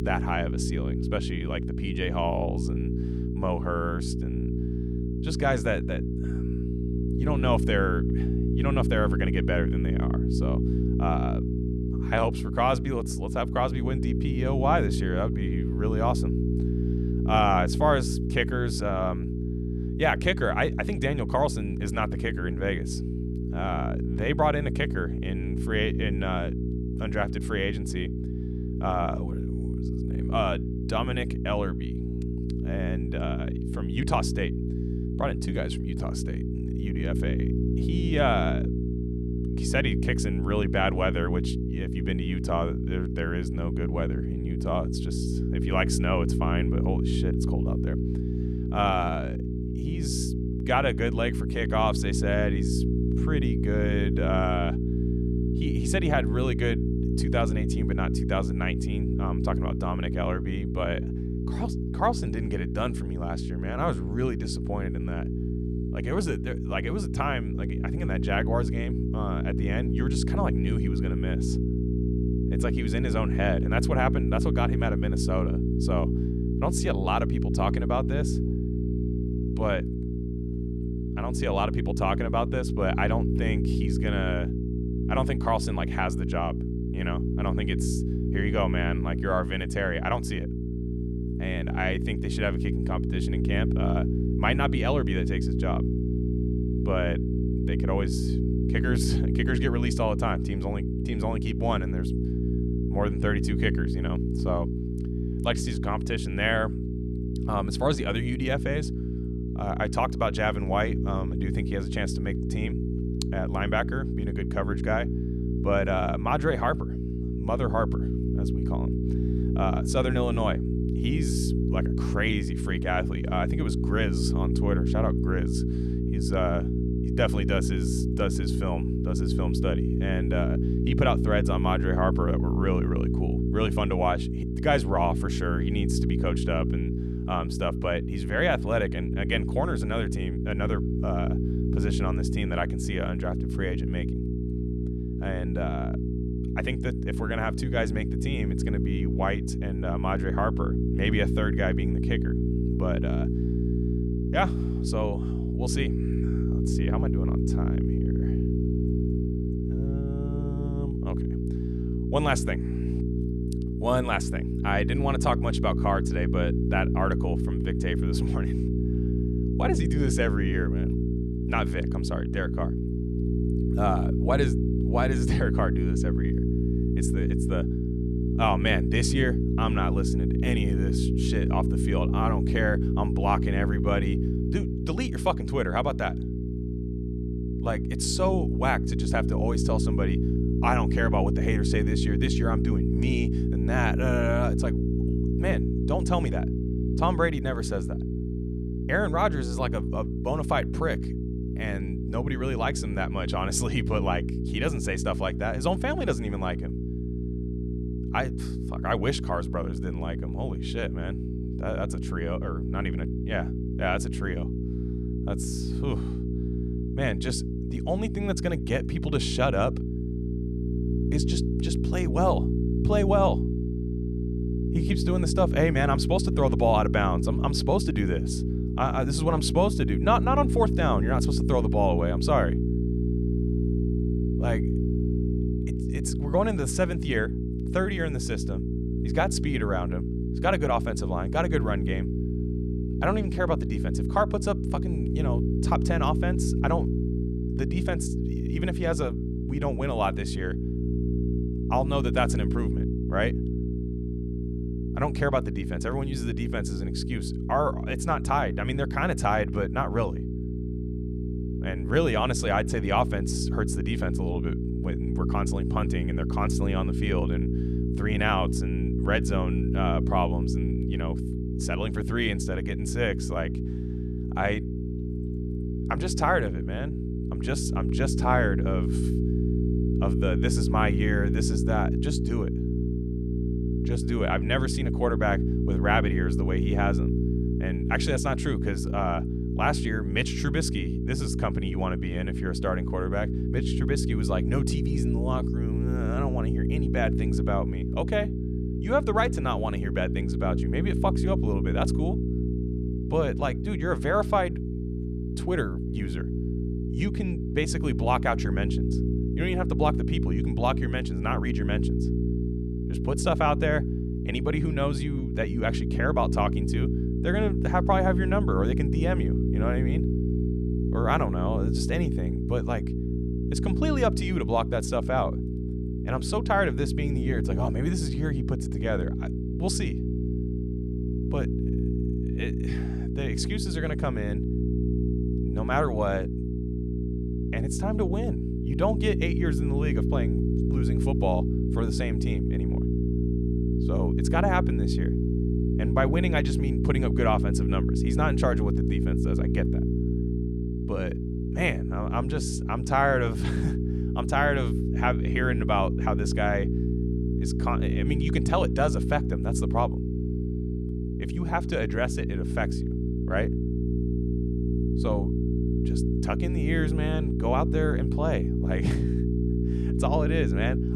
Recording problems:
electrical hum; loud; throughout; 60 Hz, 6 dB below the speech

